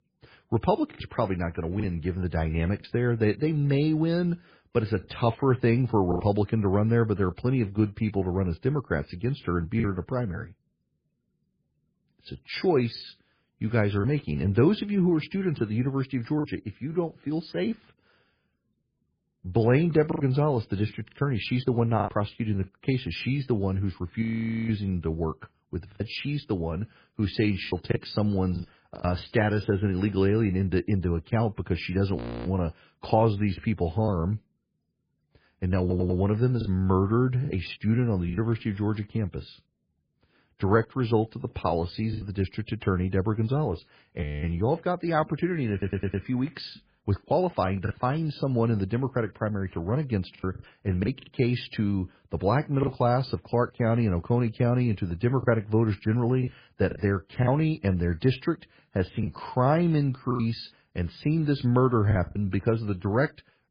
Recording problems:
garbled, watery; badly; nothing above 5 kHz
choppy; occasionally; 4% of the speech affected
audio freezing; at 24 s, at 32 s and at 44 s
audio stuttering; at 36 s and at 46 s

